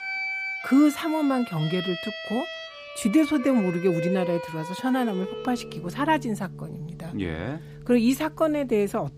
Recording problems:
background music; loud; throughout; 9 dB below the speech

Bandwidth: 15 kHz